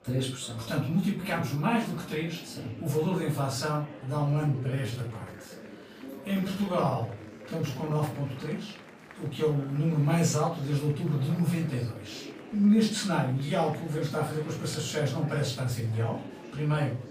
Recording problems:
off-mic speech; far
room echo; slight; dies away in 0.3 s
murmuring crowd; noticeable; throughout; 15 dB below the speech
uneven, jittery; strongly; from 4.5 to 16 s

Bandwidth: 15 kHz